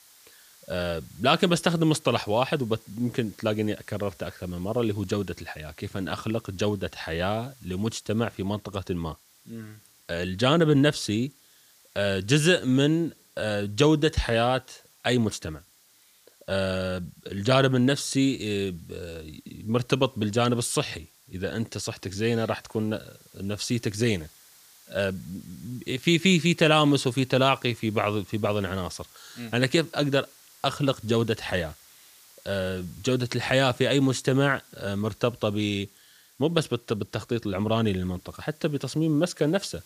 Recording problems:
hiss; faint; throughout; 25 dB below the speech

